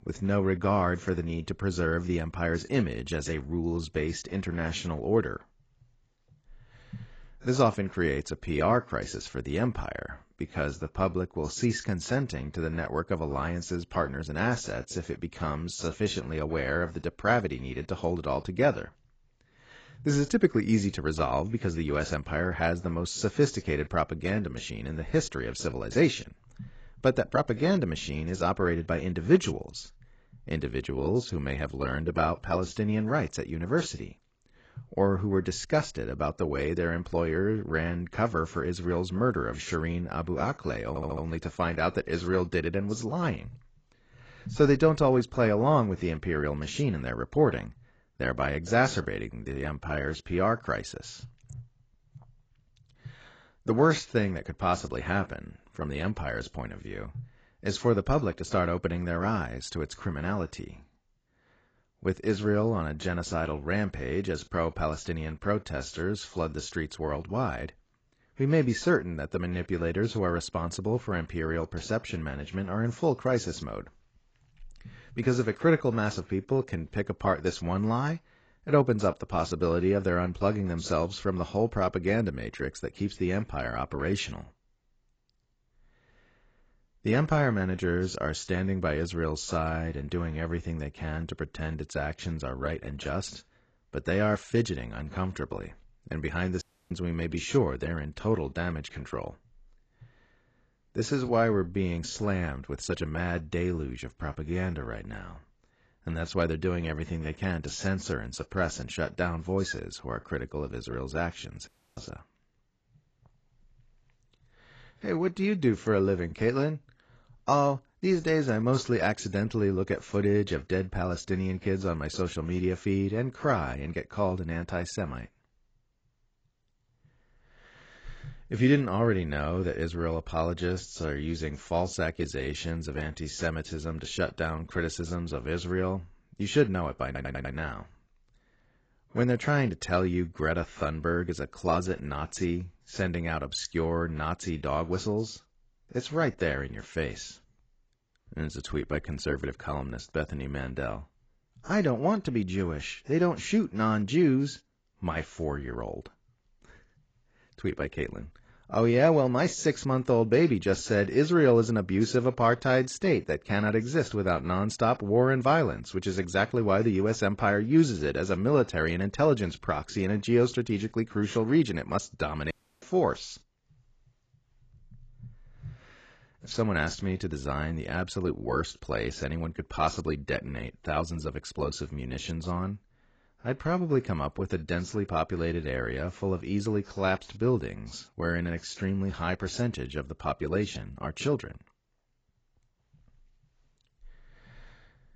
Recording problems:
garbled, watery; badly; nothing above 7.5 kHz
audio stuttering; at 41 s and at 2:17
audio cutting out; at 1:37, at 1:52 and at 2:53

